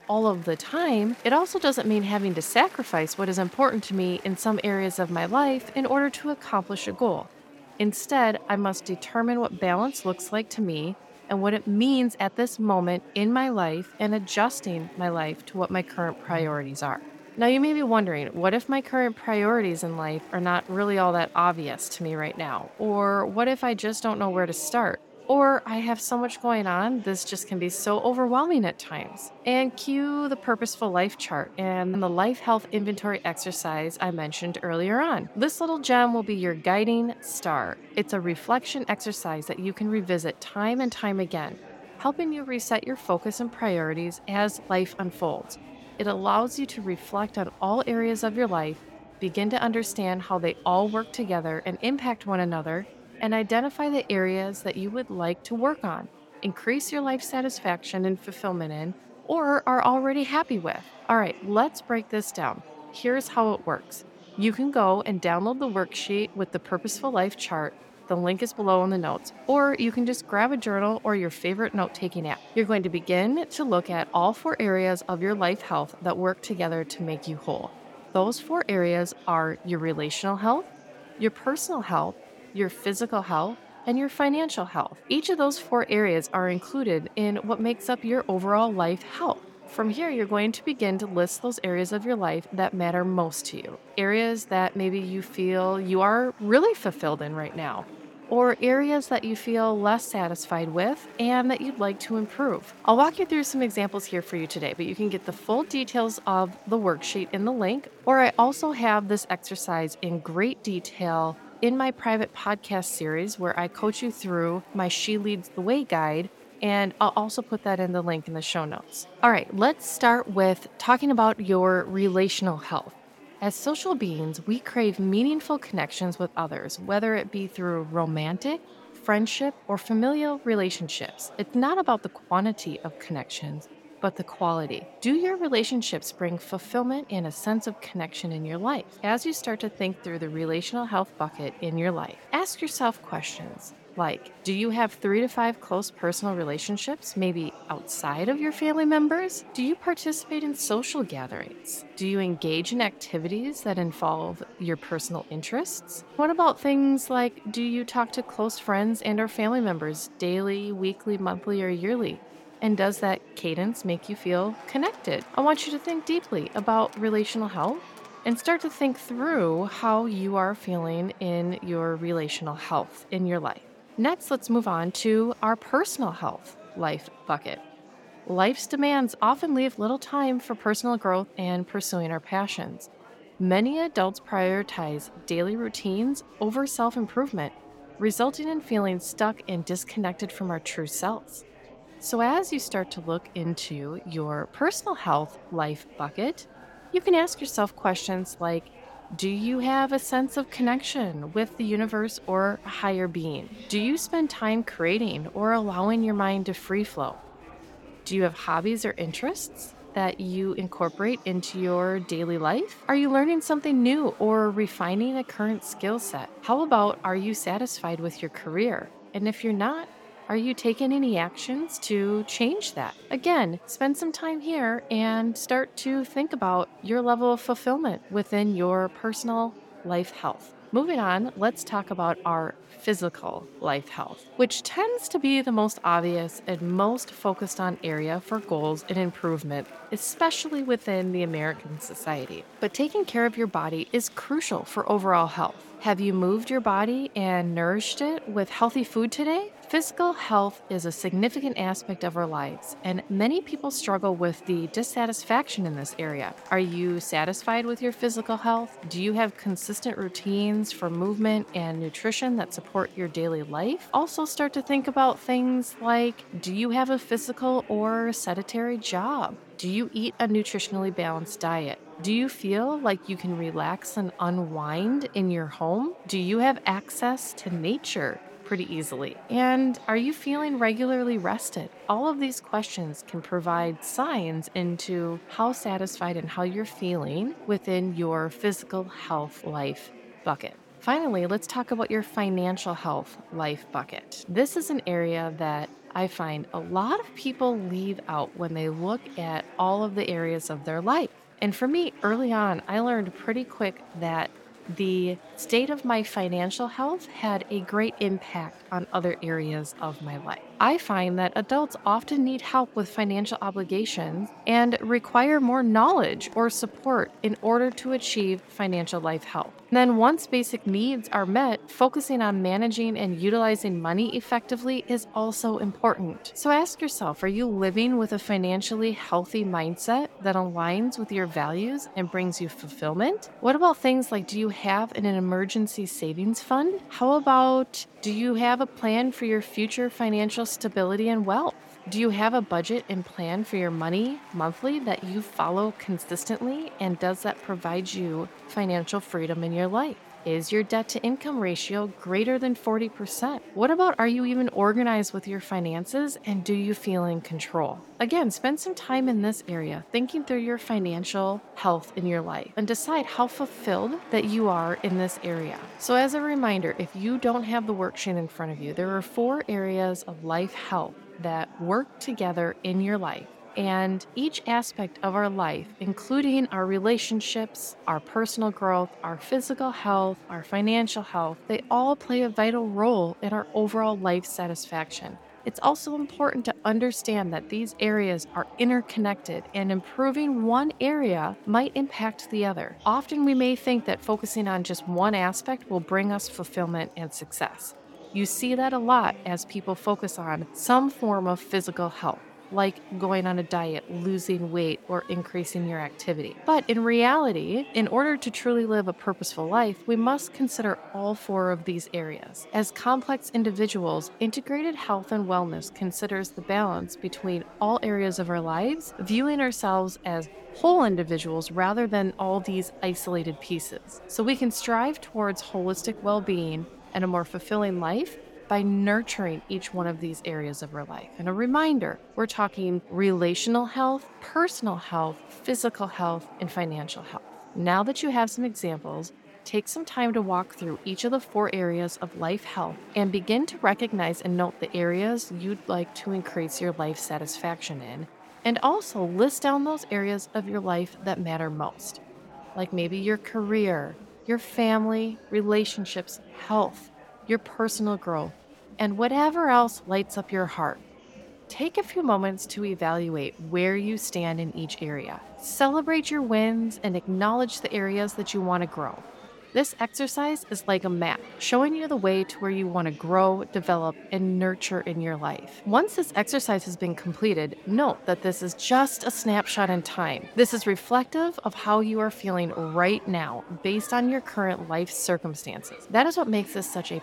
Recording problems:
murmuring crowd; faint; throughout; 20 dB below the speech

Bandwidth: 17 kHz